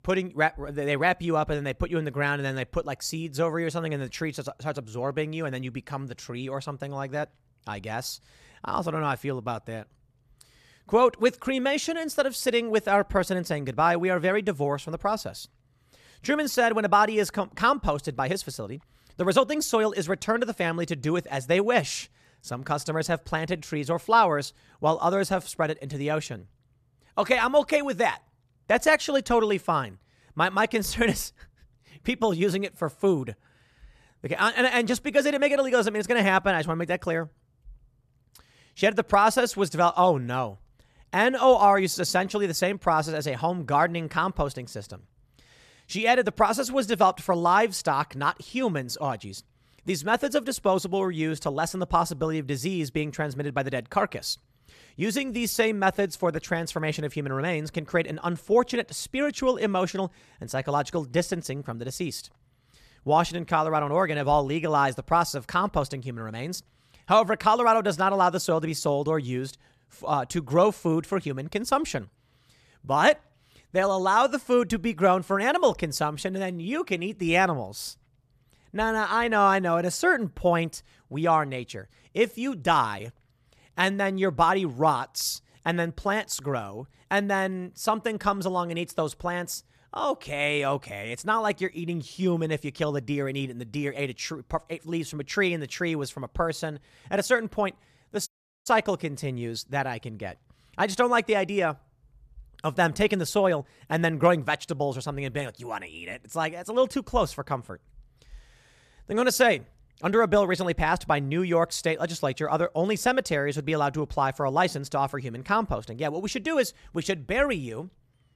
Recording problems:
audio cutting out; at 1:38

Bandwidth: 14 kHz